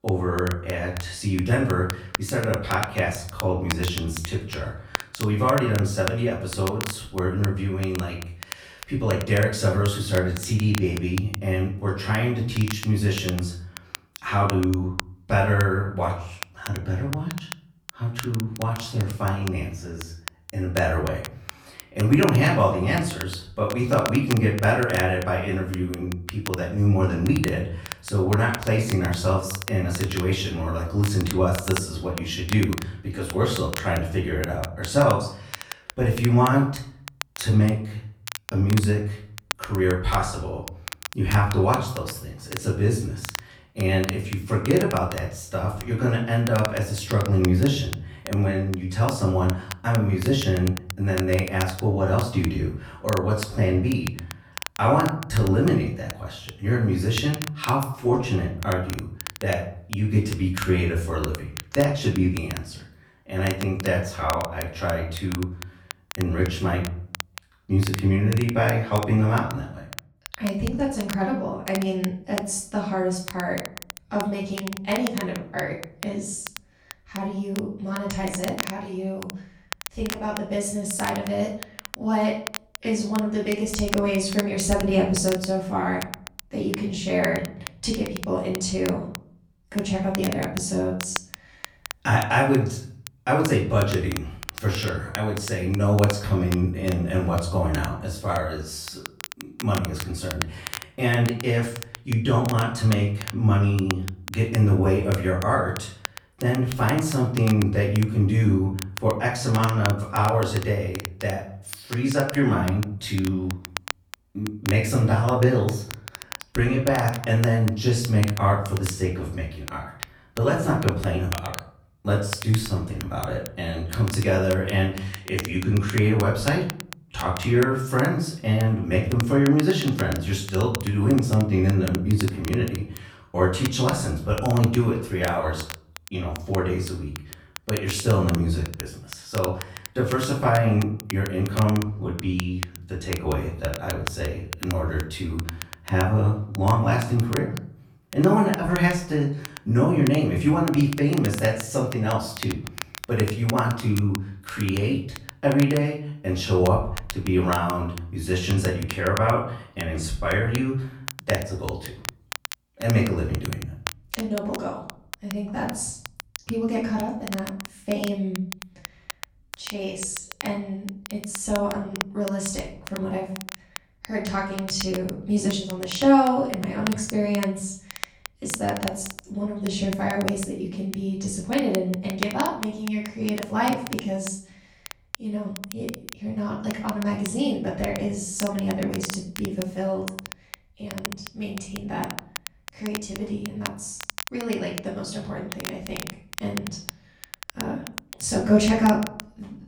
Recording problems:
off-mic speech; far
room echo; slight; dies away in 0.5 s
crackle, like an old record; noticeable; 15 dB below the speech

